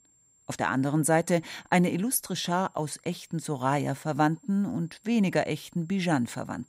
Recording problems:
high-pitched whine; faint; throughout; 7.5 kHz, 35 dB below the speech

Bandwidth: 15.5 kHz